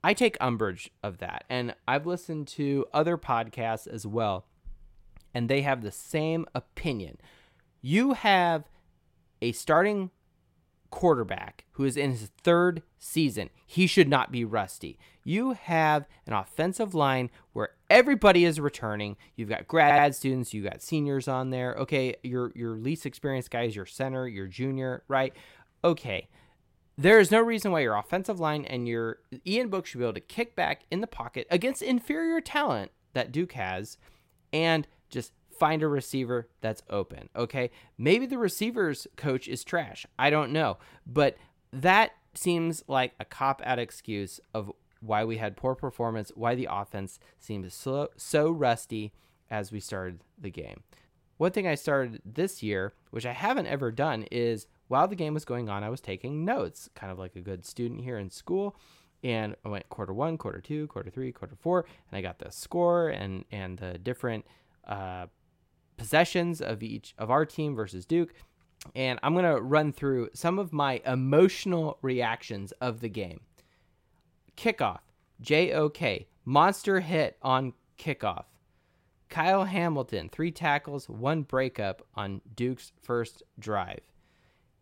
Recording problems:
audio stuttering; at 20 s

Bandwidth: 16 kHz